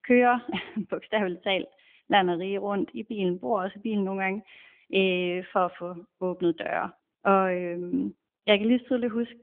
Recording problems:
phone-call audio; nothing above 3.5 kHz

